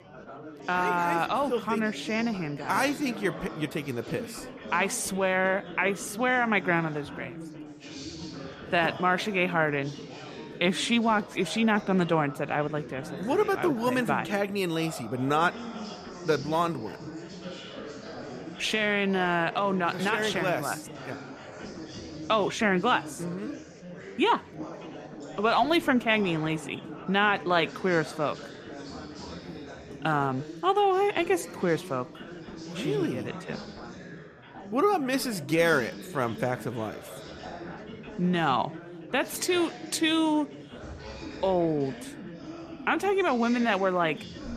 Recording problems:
chatter from many people; noticeable; throughout; 15 dB below the speech

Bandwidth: 14.5 kHz